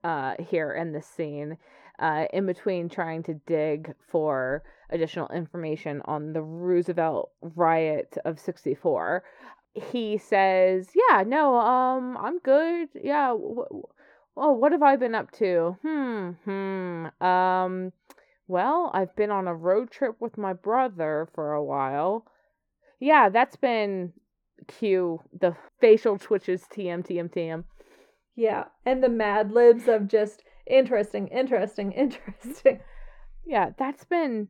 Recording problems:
muffled; very; fading above 2.5 kHz

